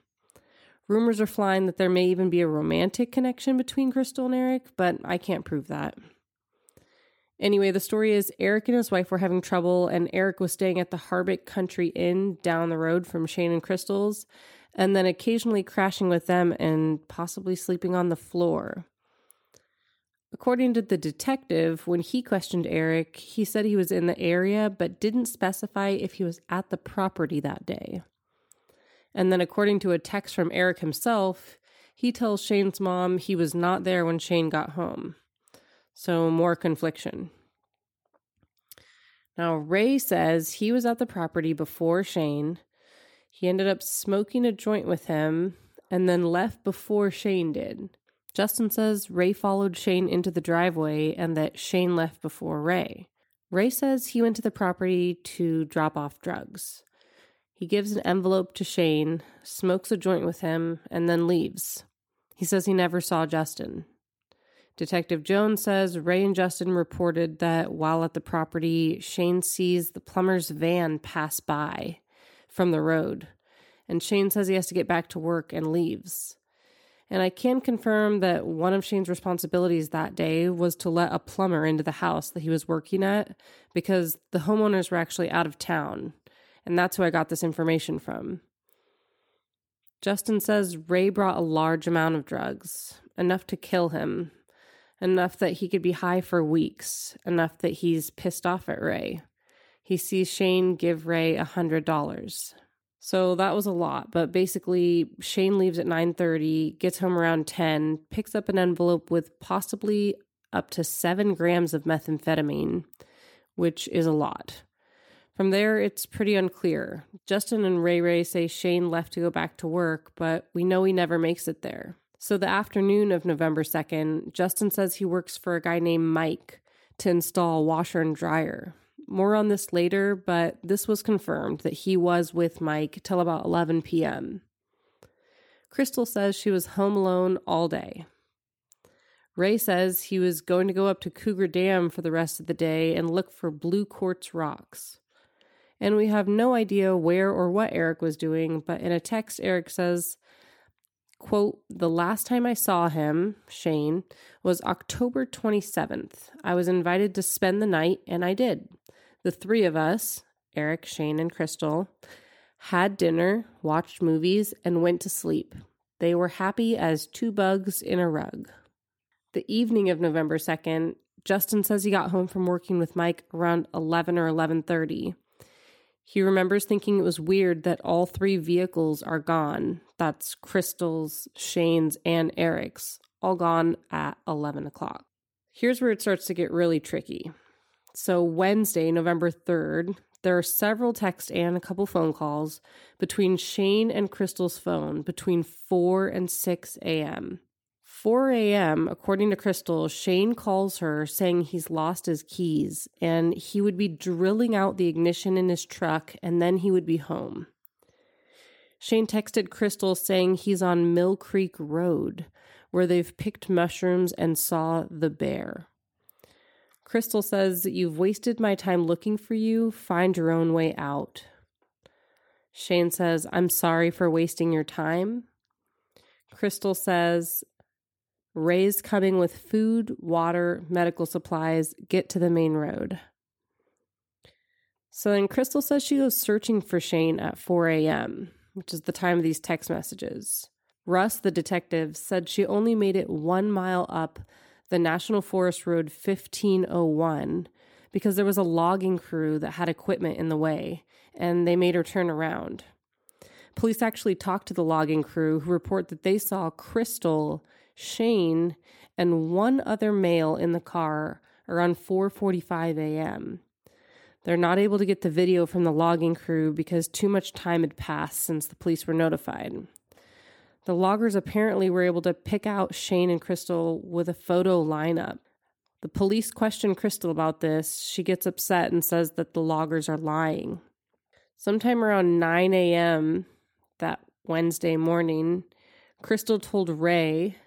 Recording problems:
none

